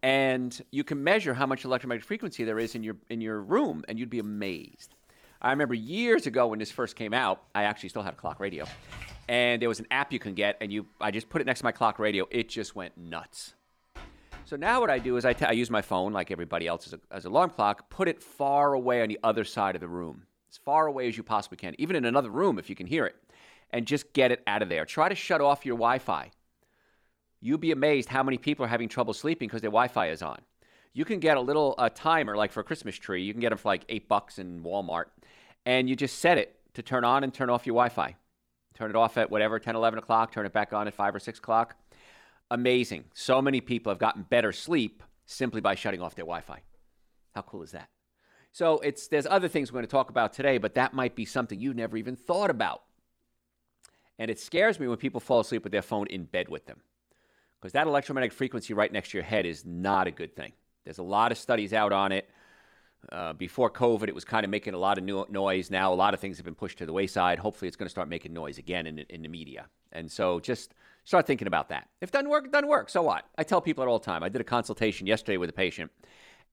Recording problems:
household noises; faint; until 17 s; 25 dB below the speech

